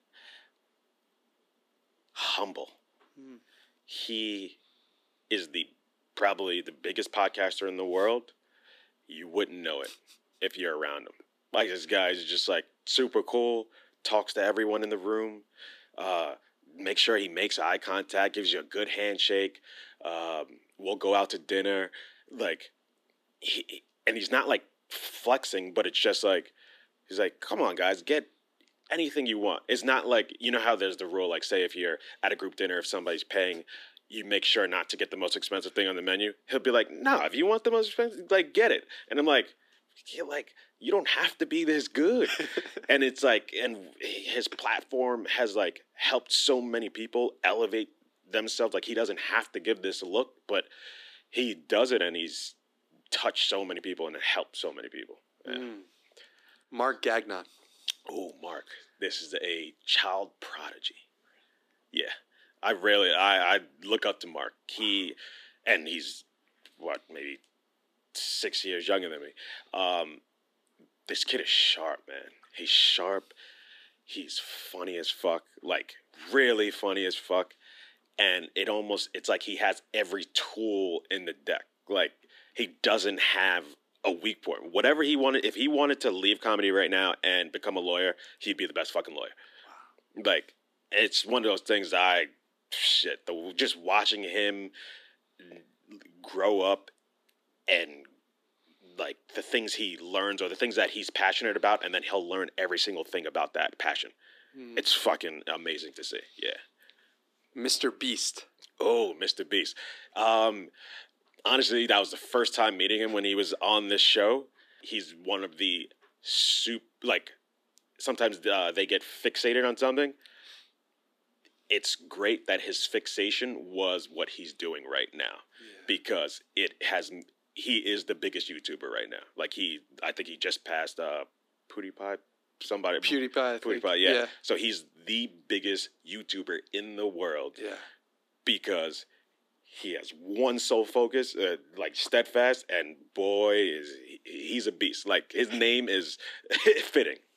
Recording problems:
thin; somewhat; fading below 300 Hz

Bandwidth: 14.5 kHz